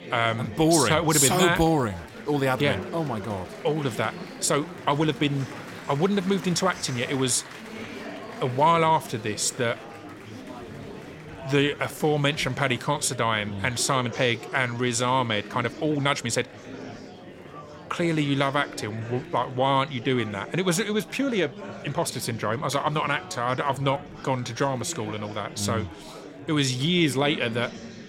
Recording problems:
murmuring crowd; noticeable; throughout; 15 dB below the speech
uneven, jittery; strongly; from 1 to 27 s

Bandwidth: 16 kHz